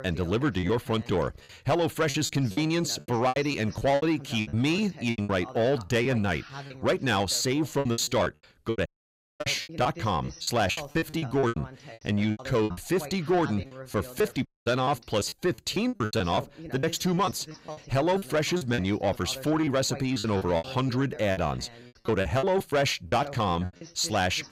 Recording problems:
distortion; slight; 10 dB below the speech
voice in the background; noticeable; throughout; 15 dB below the speech
choppy; very; 14% of the speech affected
audio cutting out; at 9 s for 0.5 s and at 14 s

